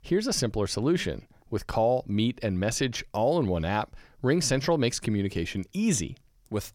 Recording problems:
none

